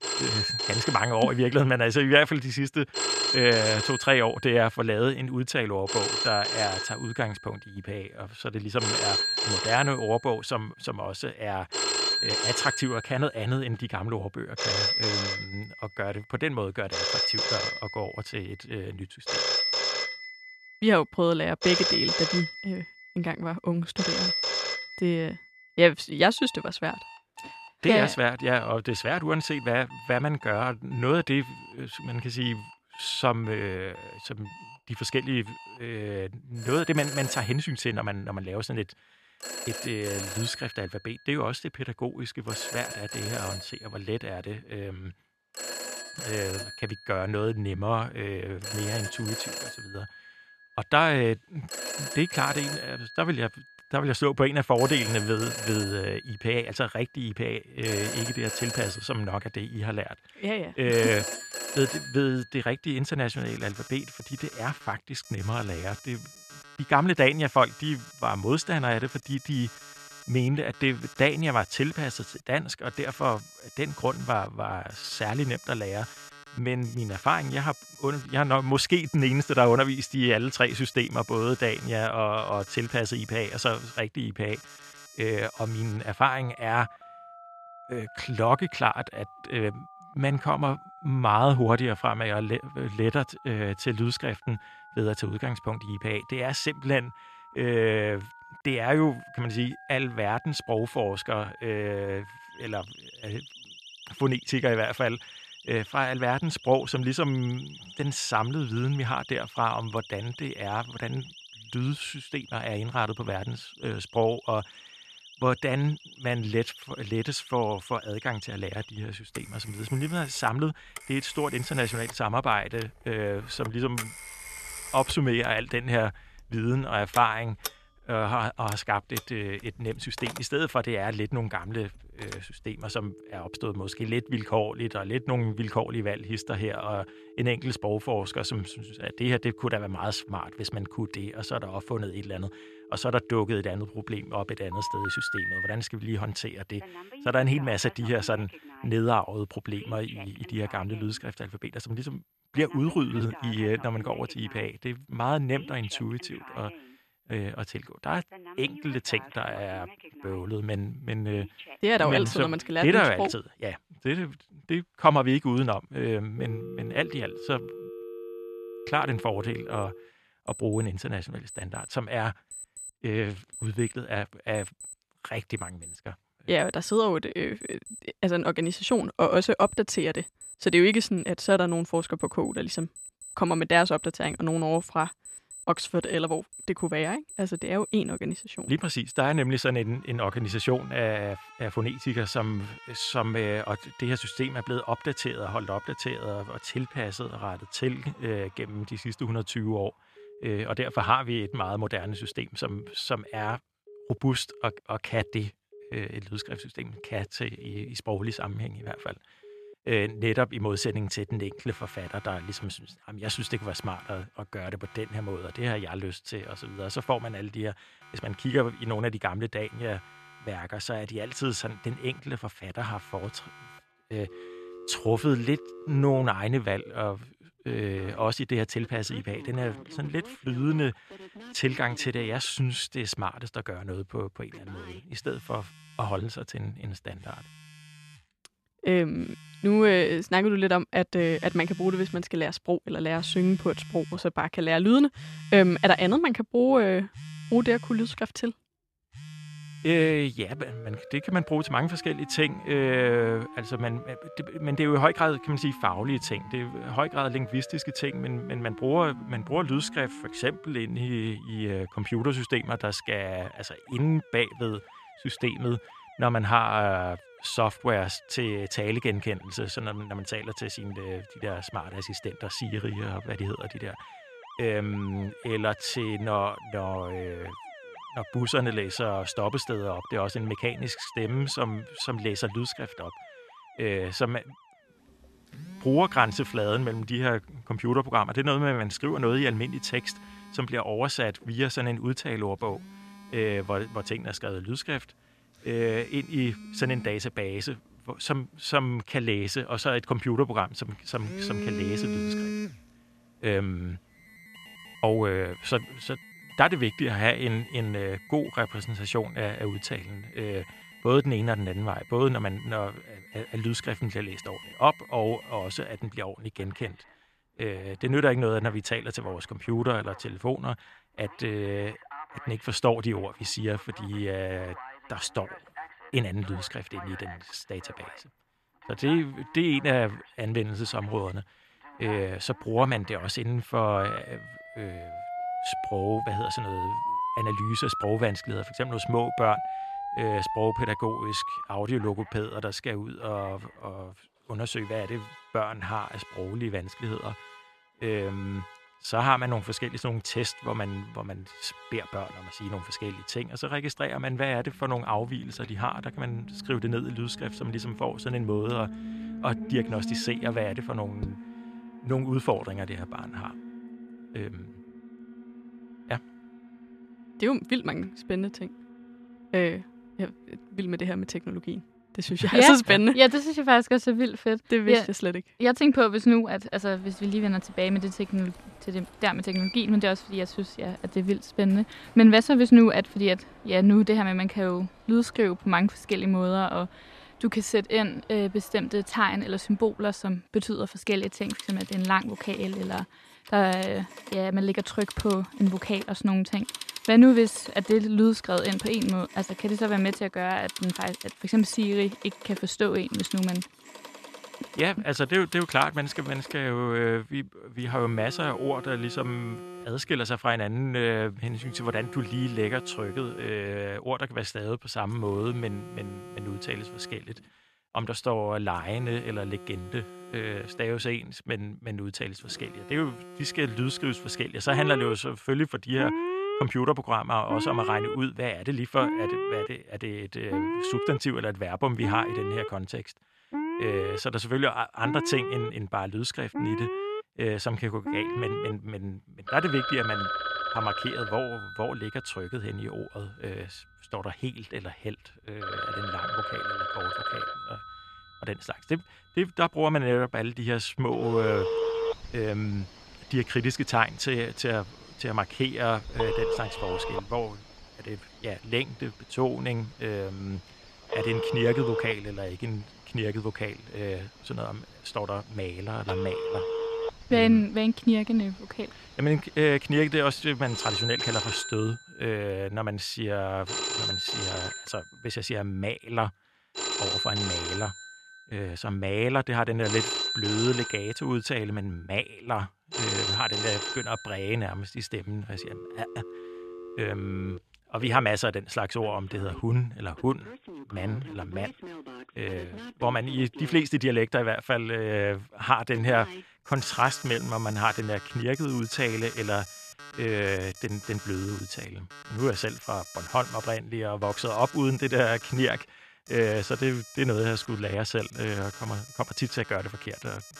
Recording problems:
alarms or sirens; loud; throughout; 8 dB below the speech

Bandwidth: 13.5 kHz